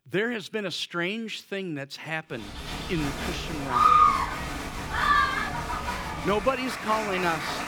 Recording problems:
crowd noise; very loud; from 2.5 s on; 4 dB above the speech

